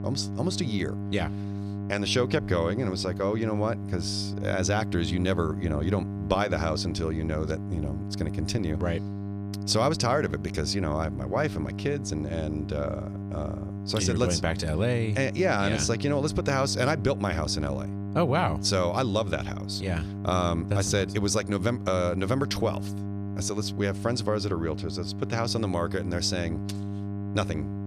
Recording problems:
electrical hum; noticeable; throughout; 50 Hz, 15 dB below the speech

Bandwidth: 13.5 kHz